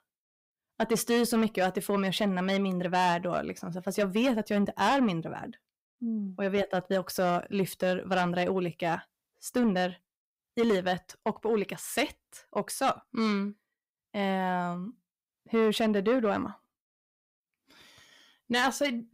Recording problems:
distortion; slight; 10 dB below the speech

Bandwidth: 15.5 kHz